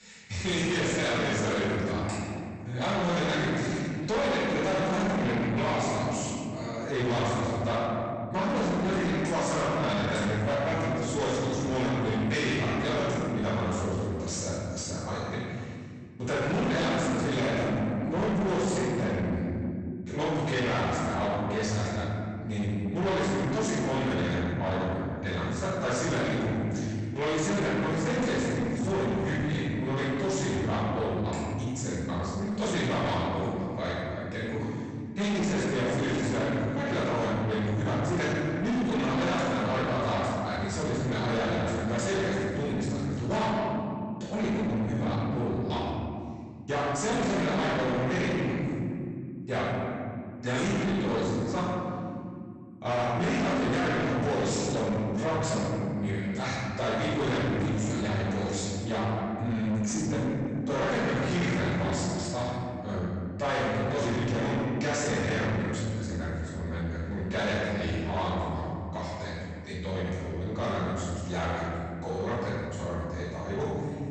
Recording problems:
distortion; heavy; 6 dB below the speech
room echo; strong; dies away in 2.1 s
off-mic speech; far
garbled, watery; slightly; nothing above 8 kHz

